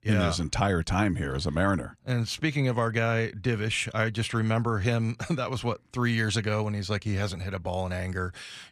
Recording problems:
none

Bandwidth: 14.5 kHz